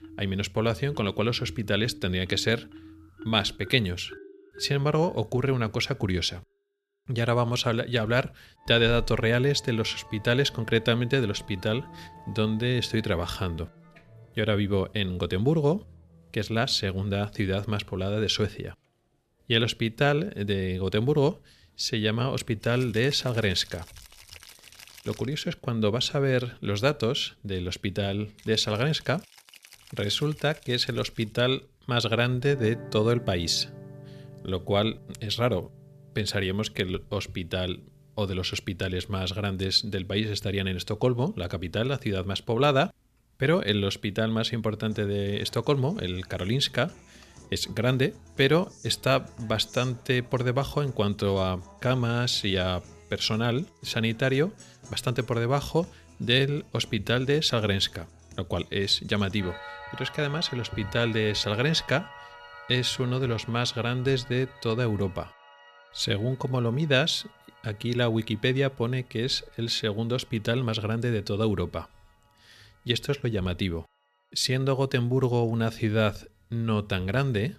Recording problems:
background music; faint; throughout; 20 dB below the speech

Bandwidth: 14.5 kHz